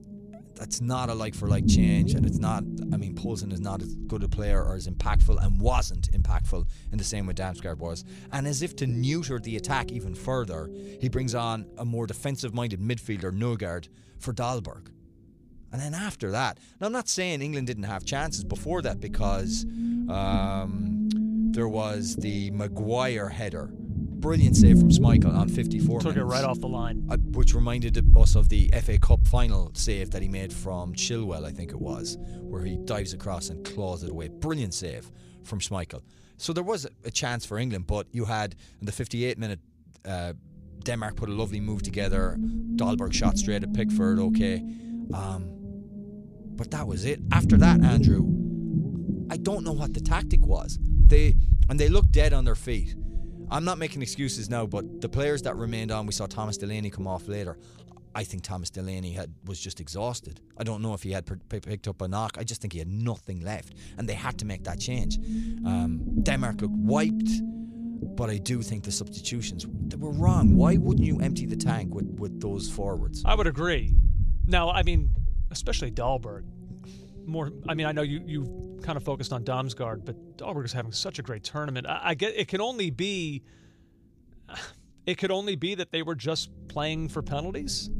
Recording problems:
low rumble; loud; throughout; 4 dB below the speech

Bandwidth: 15 kHz